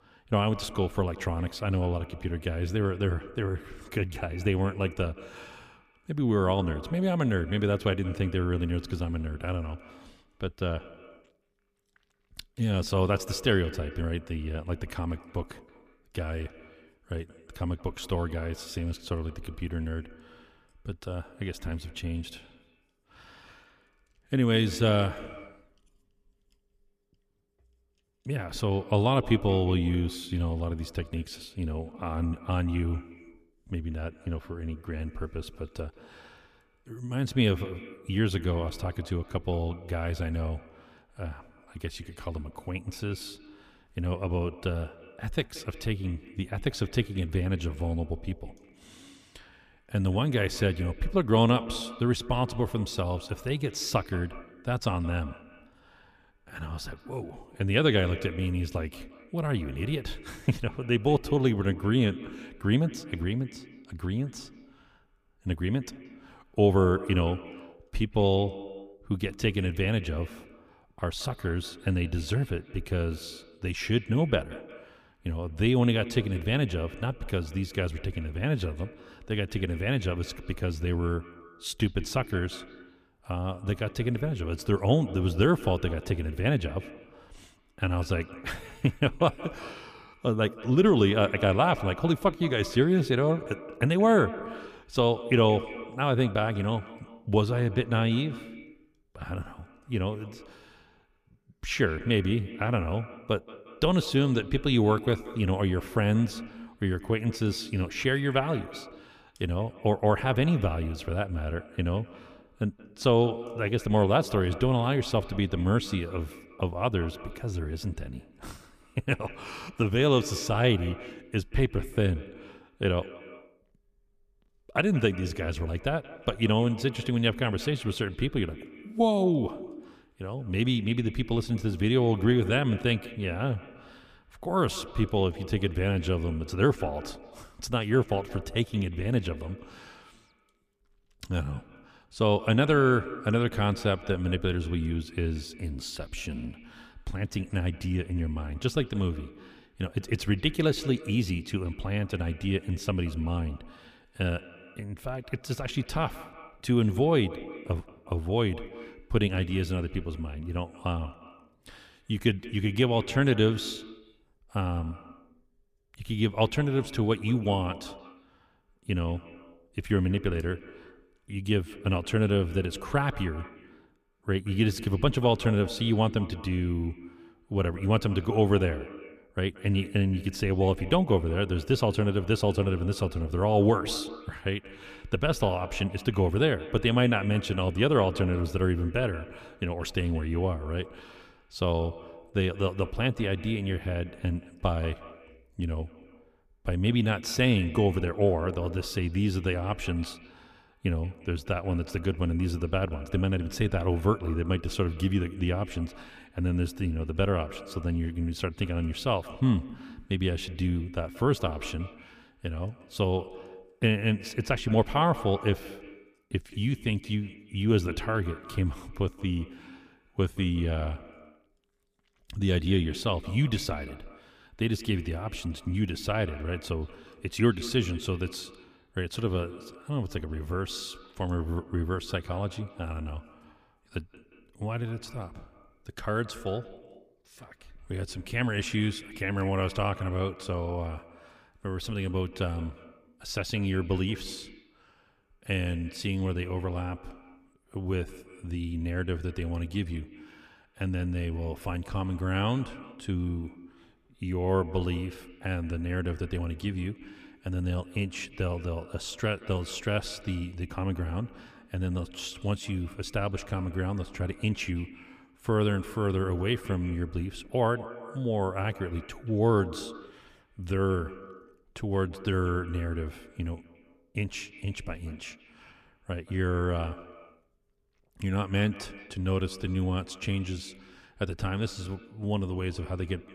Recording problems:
echo of what is said; noticeable; throughout; 180 ms later, 15 dB below the speech

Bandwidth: 15 kHz